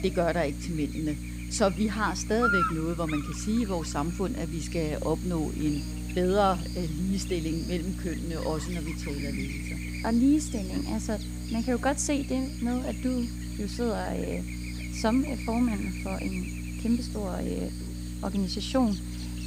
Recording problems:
electrical hum; loud; throughout; 60 Hz, 6 dB below the speech

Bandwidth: 15.5 kHz